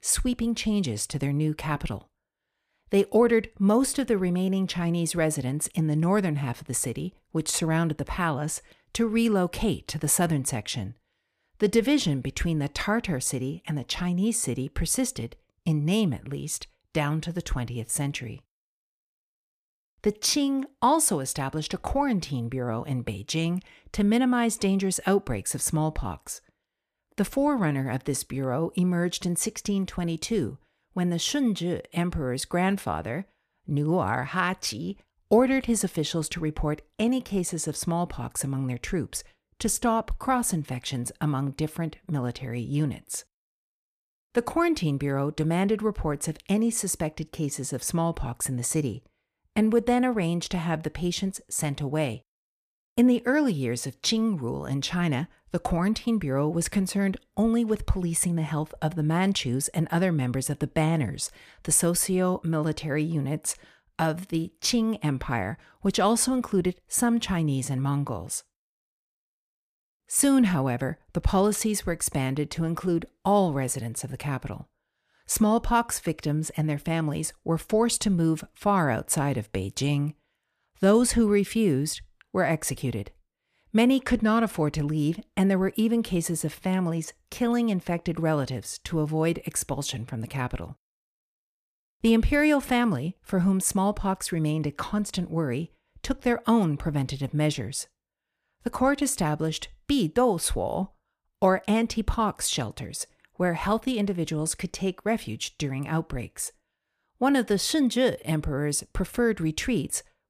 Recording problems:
none

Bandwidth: 14.5 kHz